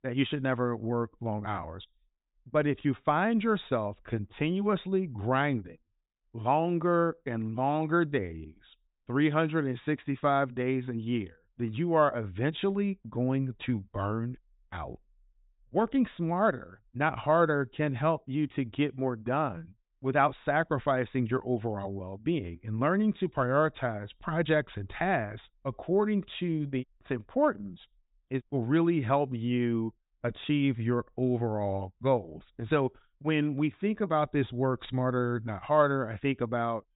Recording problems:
high frequencies cut off; severe; nothing above 4 kHz

